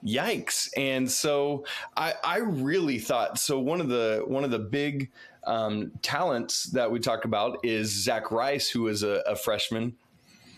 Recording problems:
squashed, flat; heavily

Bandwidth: 14 kHz